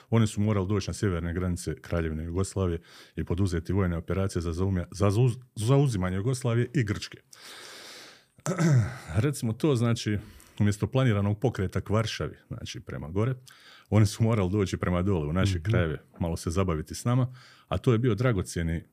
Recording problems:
none

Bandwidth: 15 kHz